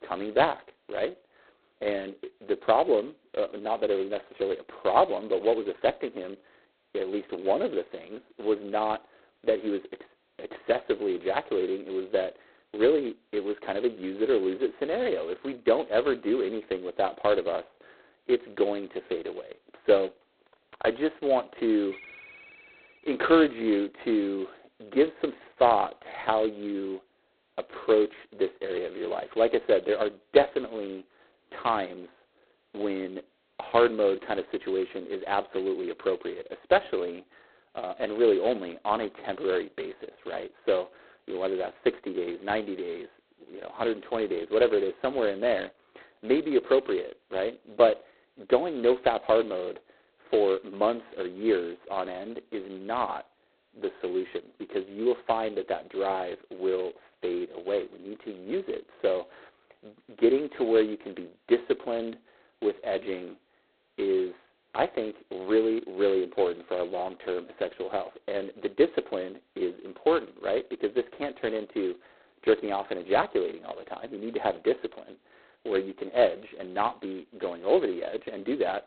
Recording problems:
phone-call audio; poor line; nothing above 4 kHz
muffled; very slightly; fading above 3 kHz
phone ringing; faint; from 22 to 23 s; peak 15 dB below the speech

